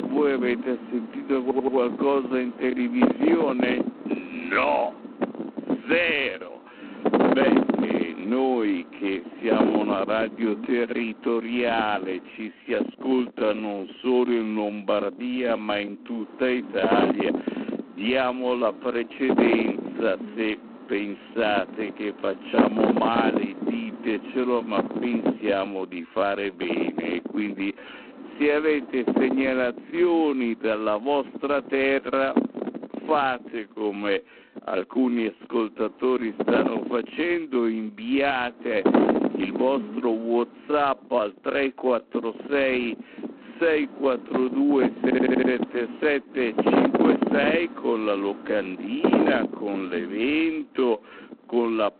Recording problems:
phone-call audio; poor line
distortion; heavy; 1.8% of the sound clipped
wrong speed, natural pitch; too slow; 0.6 times normal speed
wind noise on the microphone; heavy; 2 dB below the speech
audio stuttering; at 1.5 s and at 45 s

